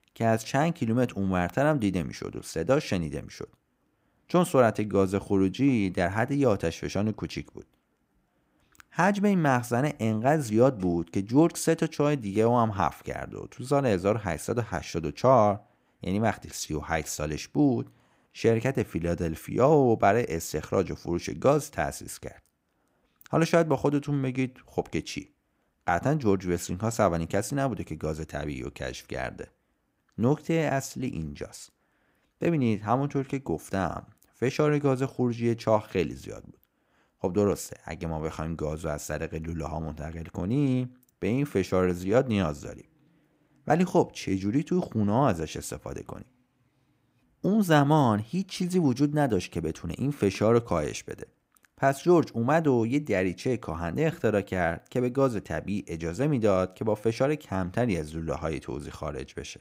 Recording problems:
none

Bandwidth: 15.5 kHz